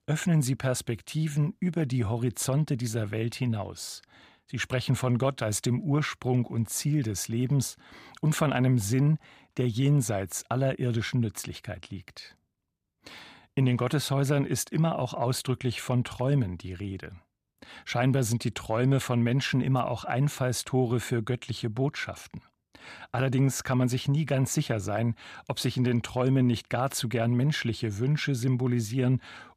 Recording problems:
none

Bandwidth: 15 kHz